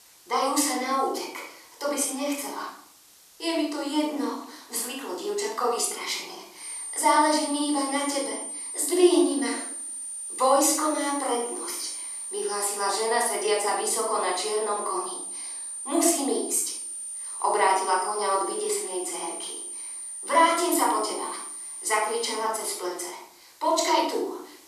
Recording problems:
off-mic speech; far
room echo; noticeable; dies away in 0.6 s
thin; somewhat; fading below 350 Hz
high-pitched whine; loud; from 6.5 to 22 s; 9 kHz, 7 dB below the speech
hiss; faint; throughout; 25 dB below the speech

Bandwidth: 14 kHz